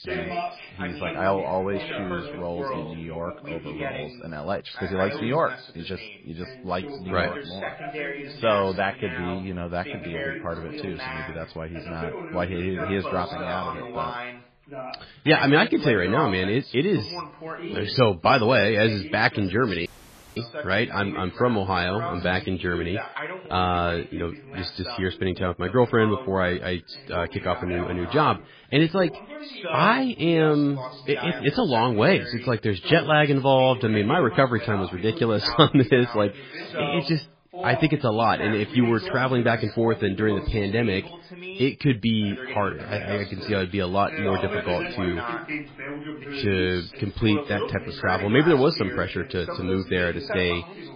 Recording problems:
garbled, watery; badly
background chatter; noticeable; throughout; 2 voices, 10 dB below the speech
audio cutting out; at 20 s for 0.5 s

